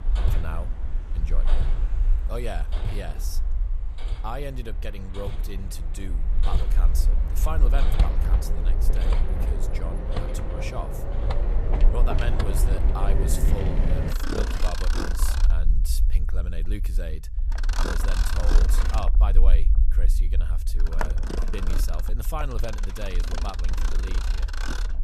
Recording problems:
machinery noise; very loud; throughout; 3 dB above the speech
low rumble; noticeable; throughout; 10 dB below the speech

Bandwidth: 14.5 kHz